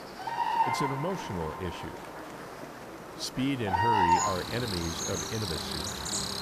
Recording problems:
animal sounds; very loud; throughout; 4 dB above the speech
murmuring crowd; noticeable; throughout; 15 dB below the speech
electrical hum; faint; throughout; 60 Hz, 20 dB below the speech

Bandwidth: 14.5 kHz